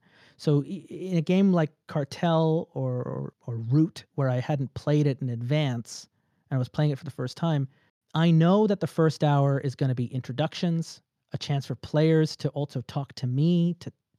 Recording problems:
none

